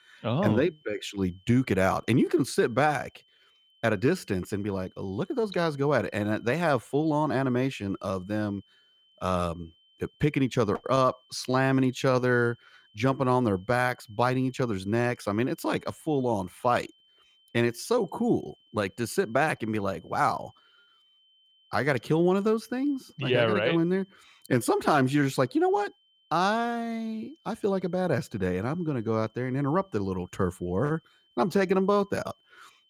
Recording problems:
high-pitched whine; faint; throughout; 3 kHz, 35 dB below the speech

